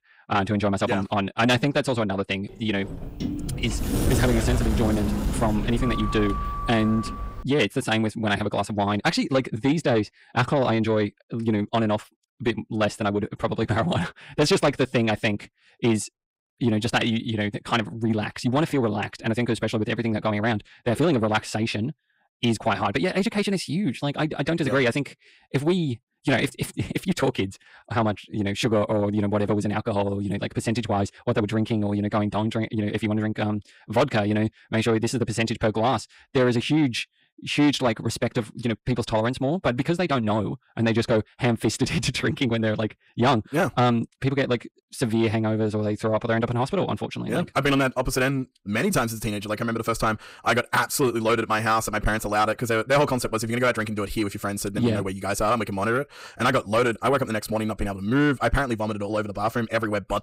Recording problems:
wrong speed, natural pitch; too fast; 1.5 times normal speed
distortion; slight; 10 dB below the speech
door banging; loud; from 3 to 7.5 s; peak 1 dB above the speech

